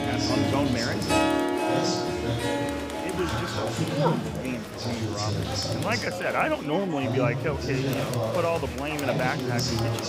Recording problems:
background music; very loud; throughout; 1 dB above the speech
chatter from many people; very loud; throughout; as loud as the speech

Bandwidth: 15.5 kHz